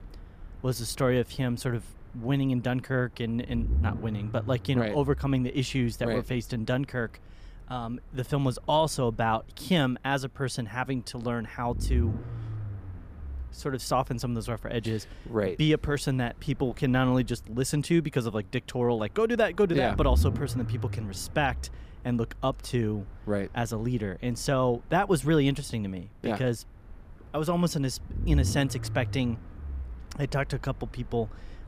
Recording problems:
low rumble; faint; throughout; 20 dB below the speech

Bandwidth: 15 kHz